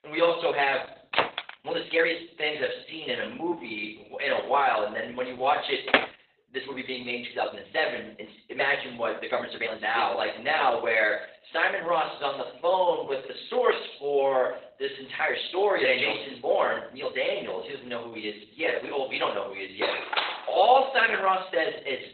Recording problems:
off-mic speech; far
garbled, watery; badly; nothing above 4 kHz
thin; very; fading below 600 Hz
room echo; slight; dies away in 0.6 s
door banging; noticeable; at 1 s; peak level with the speech
uneven, jittery; strongly; from 1.5 to 21 s
door banging; loud; at 6 s; peak 3 dB above the speech
clattering dishes; loud; at 20 s; peak level with the speech

